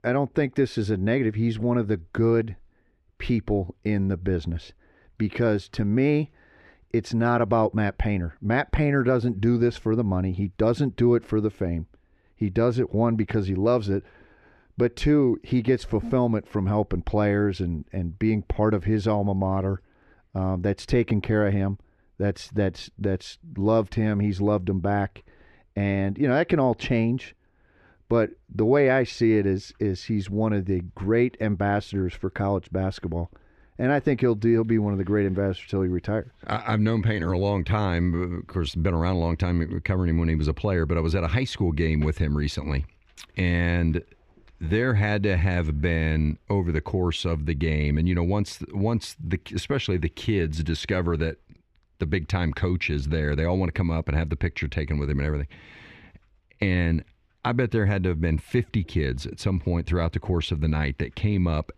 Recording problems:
muffled; slightly; fading above 4 kHz

